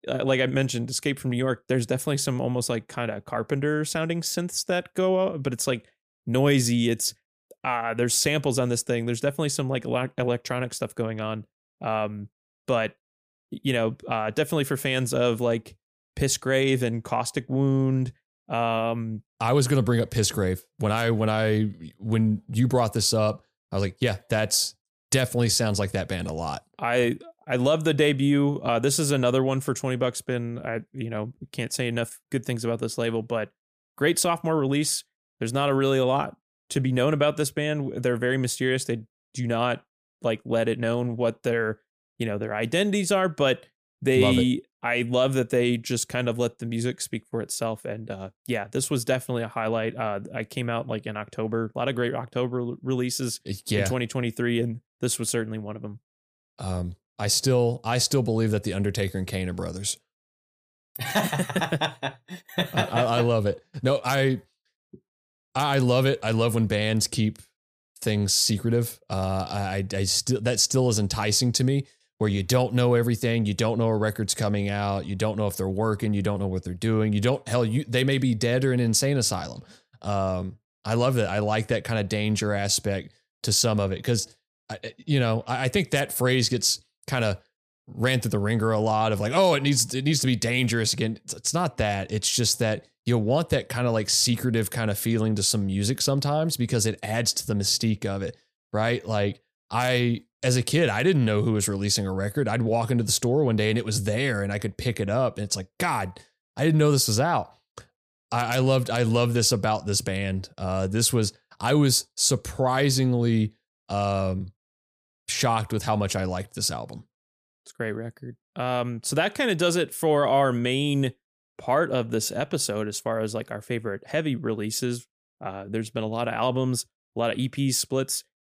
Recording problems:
none

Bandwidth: 15 kHz